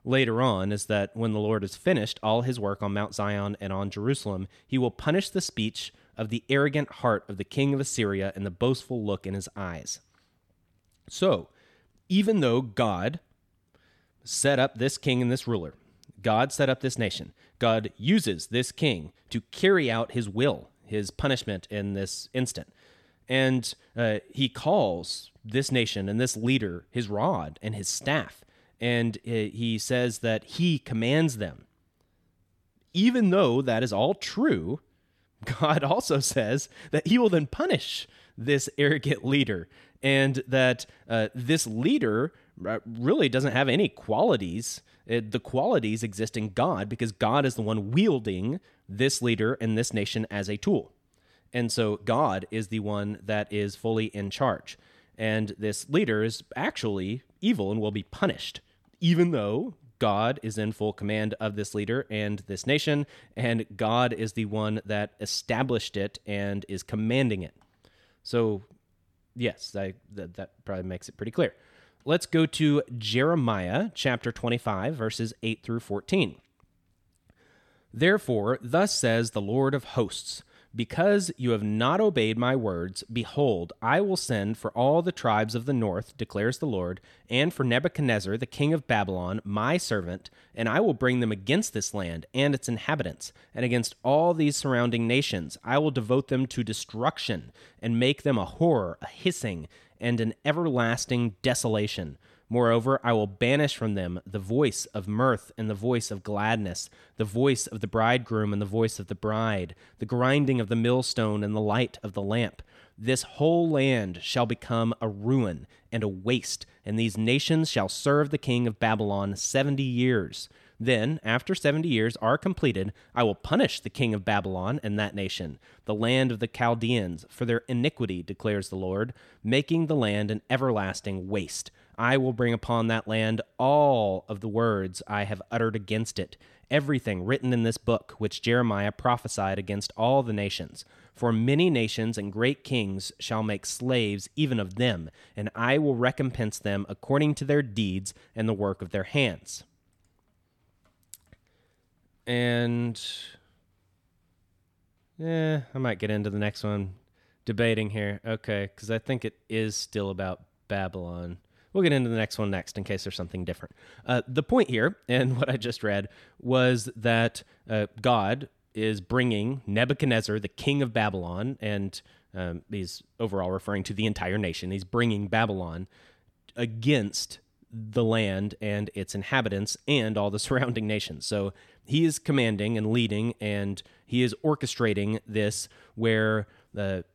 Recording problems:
none

